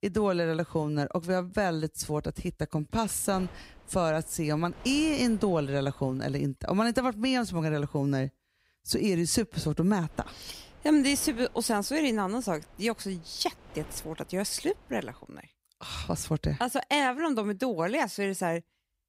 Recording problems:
wind noise on the microphone; occasional gusts; from 3.5 to 6.5 s and from 10 to 15 s; 20 dB below the speech

